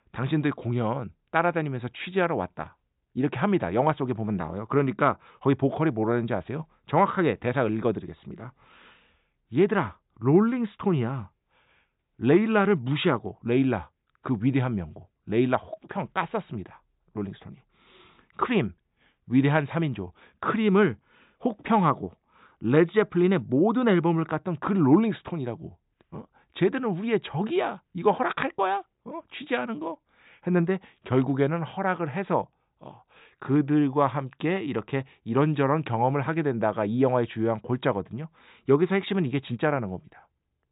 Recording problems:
high frequencies cut off; severe; nothing above 4 kHz

